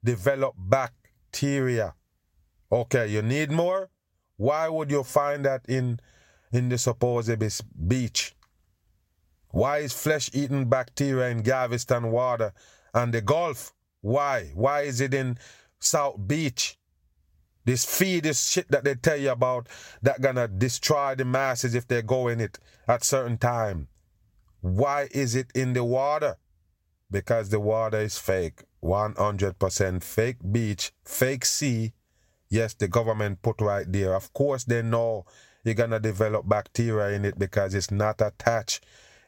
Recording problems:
squashed, flat; heavily

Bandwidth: 16 kHz